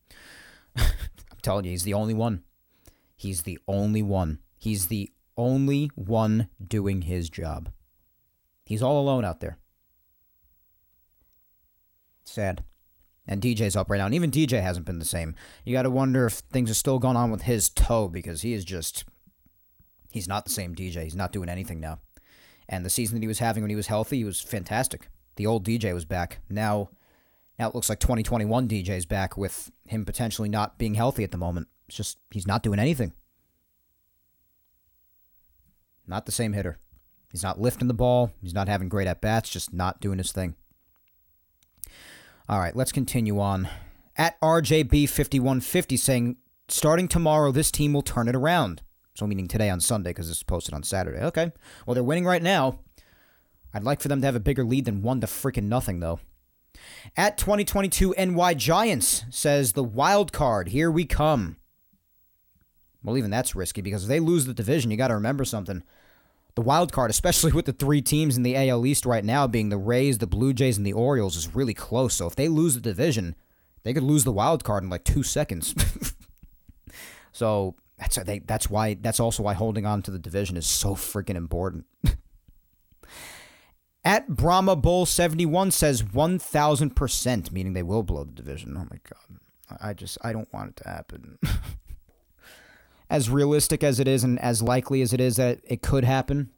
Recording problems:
uneven, jittery; strongly; from 16 s to 1:07

